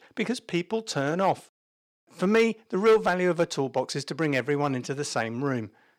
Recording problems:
distortion; slight; 1.9% of the sound clipped

